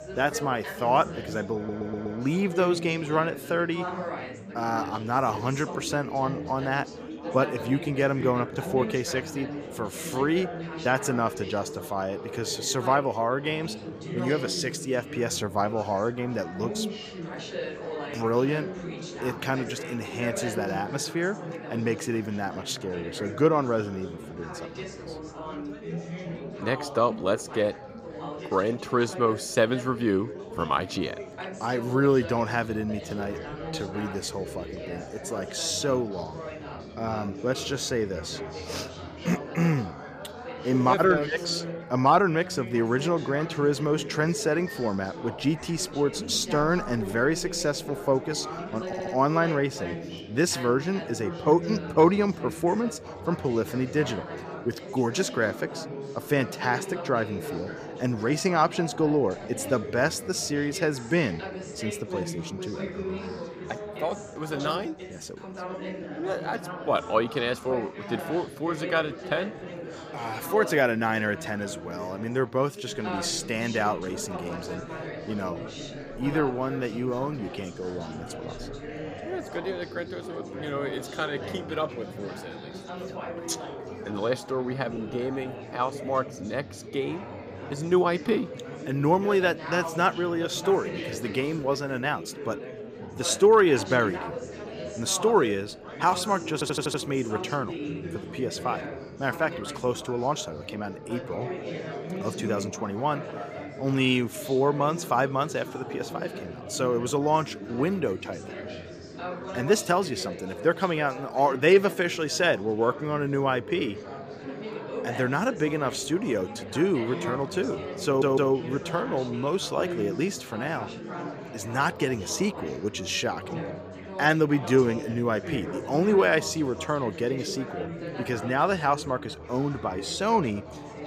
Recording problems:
chatter from many people; loud; throughout; 10 dB below the speech
audio stuttering; 4 times, first at 1.5 s

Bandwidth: 15 kHz